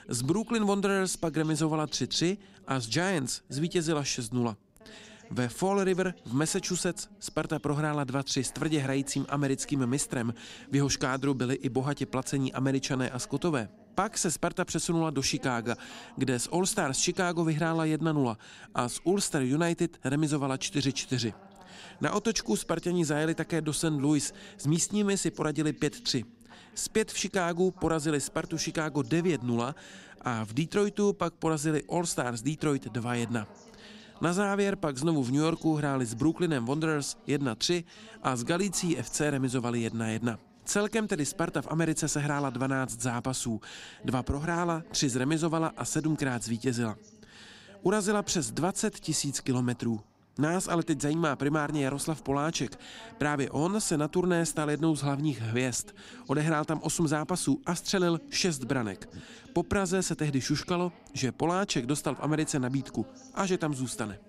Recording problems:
voice in the background; faint; throughout; 25 dB below the speech

